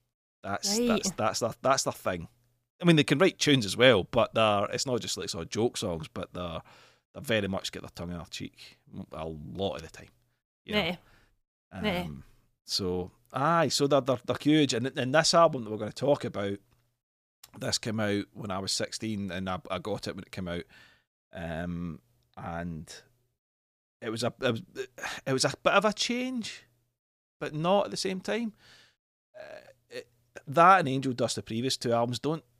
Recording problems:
none

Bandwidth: 15 kHz